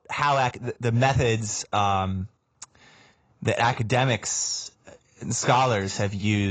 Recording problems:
garbled, watery; badly; nothing above 7.5 kHz
abrupt cut into speech; at the end

